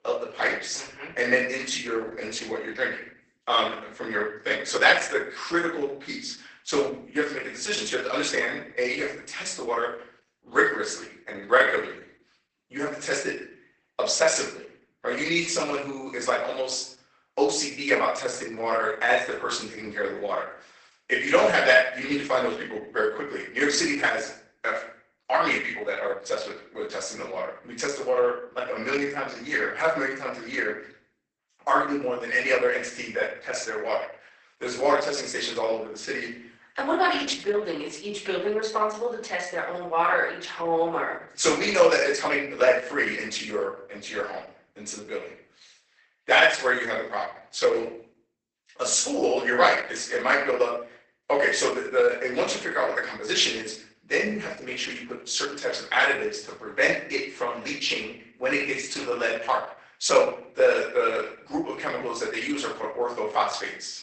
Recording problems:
off-mic speech; far
garbled, watery; badly; nothing above 8 kHz
thin; somewhat; fading below 450 Hz
room echo; slight; dies away in 0.5 s
uneven, jittery; strongly; from 11 to 48 s

